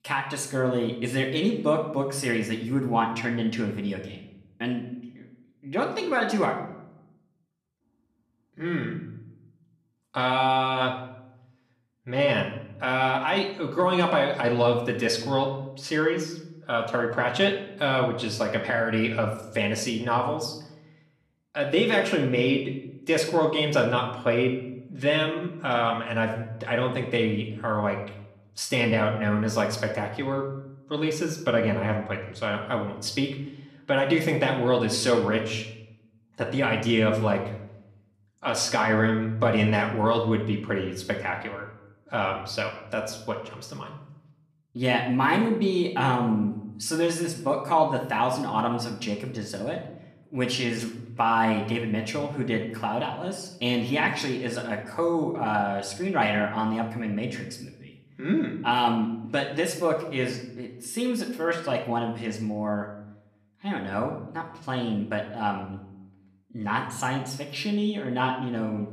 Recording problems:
room echo; slight; dies away in 0.6 s
off-mic speech; somewhat distant

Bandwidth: 14 kHz